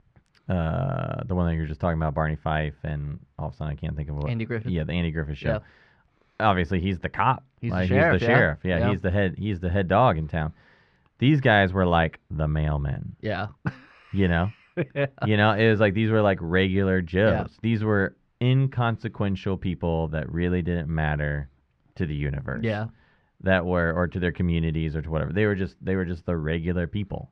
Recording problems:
muffled; very; fading above 1.5 kHz

